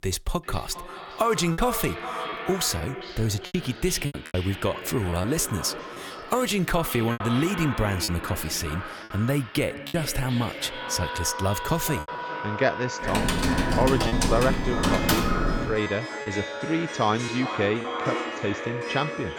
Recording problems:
echo of what is said; strong; throughout; 400 ms later, 8 dB below the speech
background music; loud; from 11 s on; 7 dB below the speech
choppy; very; 5% of the speech affected
keyboard typing; loud; from 13 to 16 s; peak 4 dB above the speech

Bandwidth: 18.5 kHz